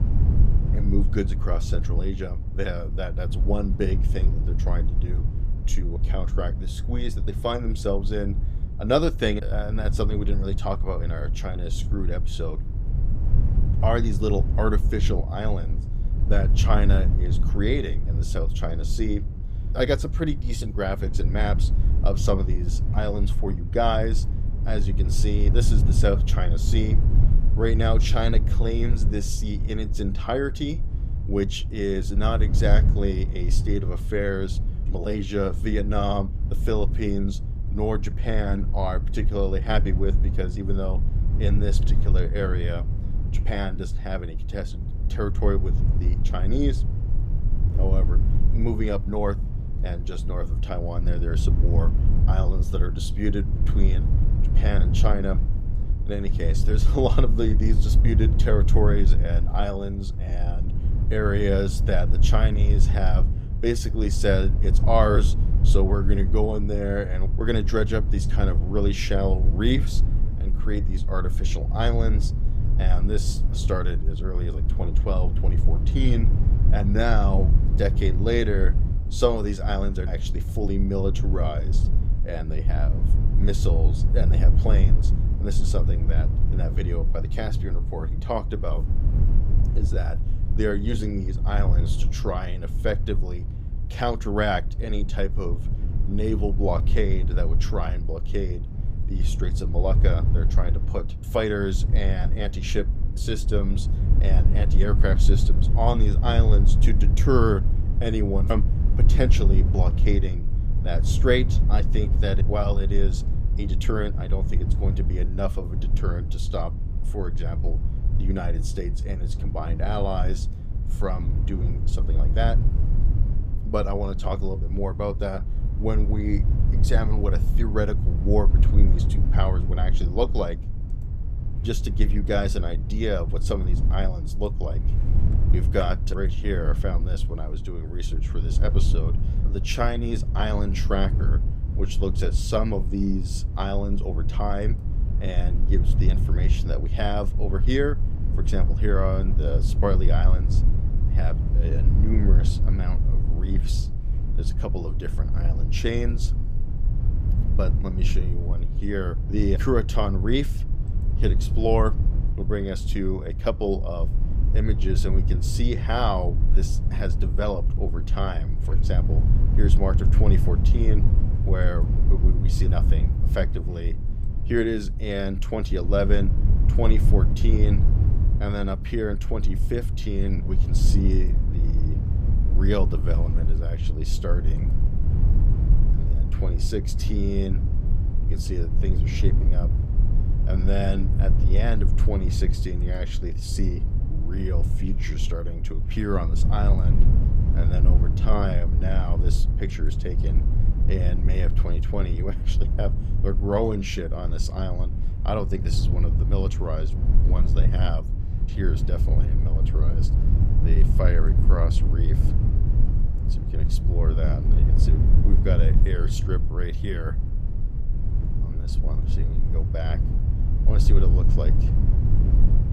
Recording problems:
low rumble; loud; throughout; 10 dB below the speech

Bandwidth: 15.5 kHz